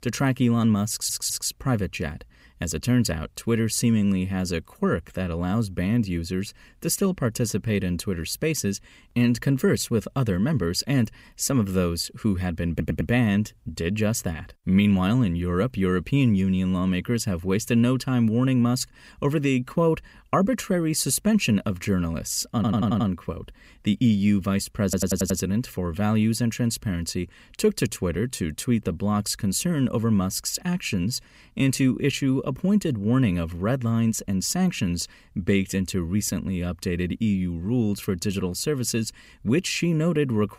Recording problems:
audio stuttering; 4 times, first at 1 s

